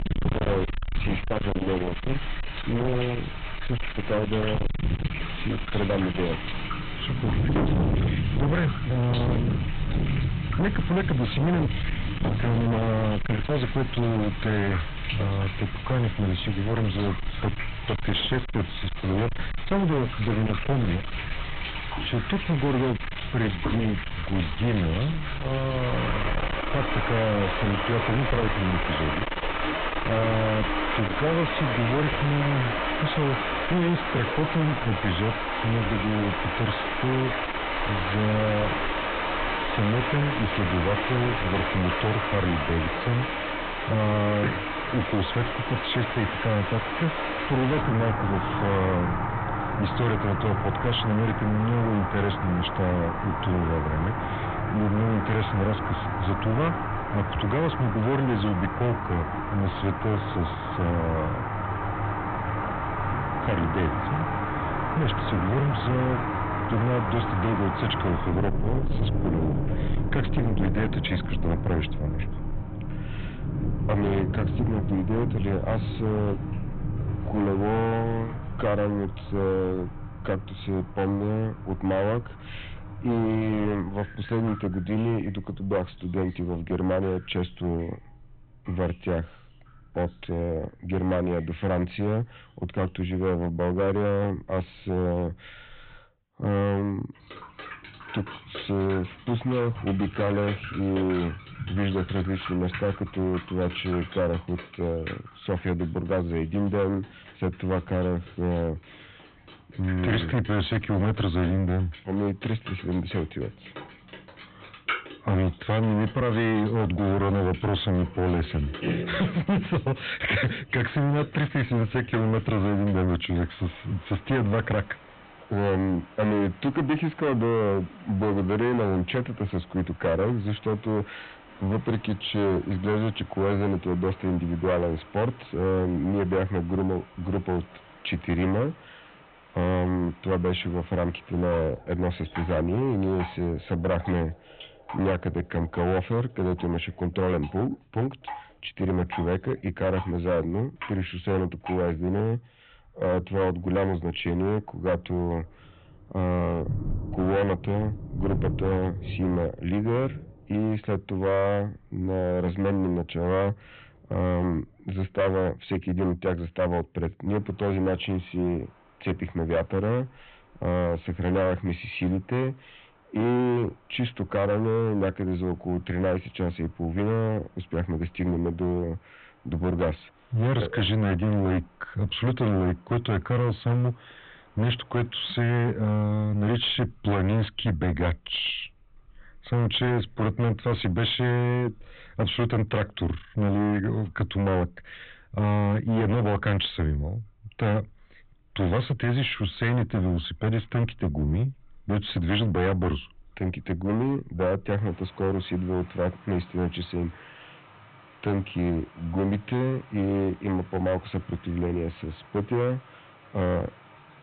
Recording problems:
distortion; heavy; 16% of the sound clipped
high frequencies cut off; severe; nothing above 3.5 kHz
rain or running water; loud; throughout; 4 dB below the speech

